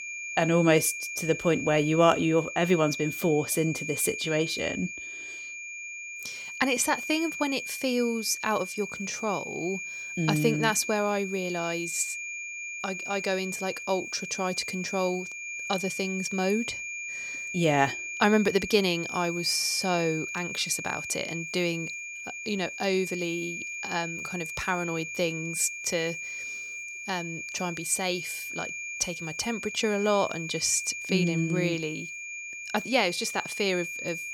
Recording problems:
high-pitched whine; loud; throughout; 2.5 kHz, 7 dB below the speech

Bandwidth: 18.5 kHz